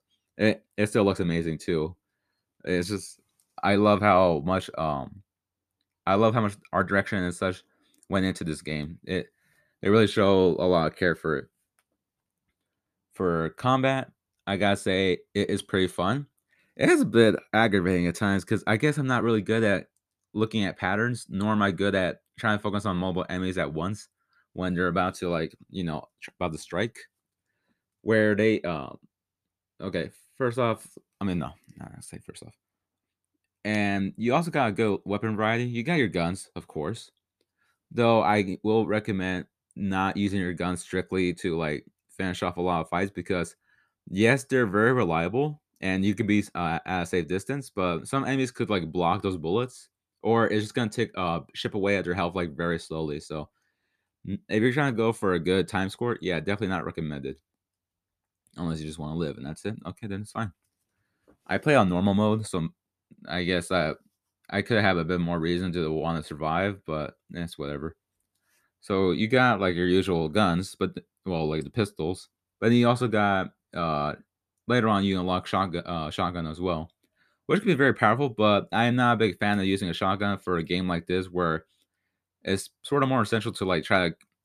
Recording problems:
none

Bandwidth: 14.5 kHz